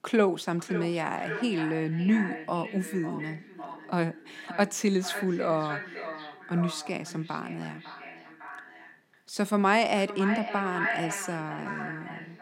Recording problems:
echo of what is said; strong; throughout; 550 ms later, 8 dB below the speech

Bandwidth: 16 kHz